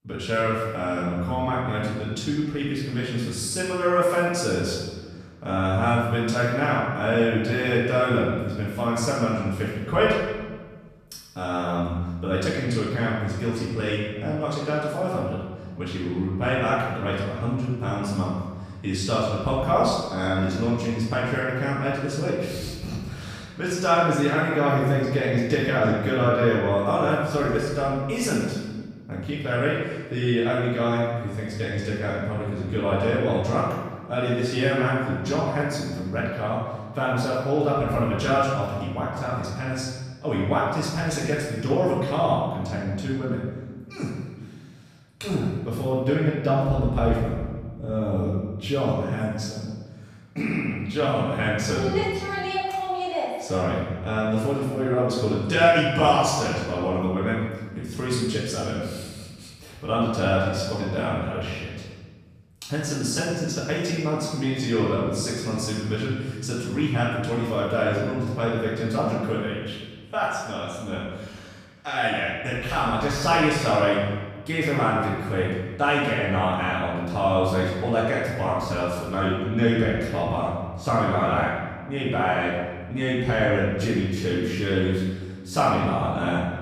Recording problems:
room echo; strong; dies away in 1.3 s
off-mic speech; far

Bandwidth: 14.5 kHz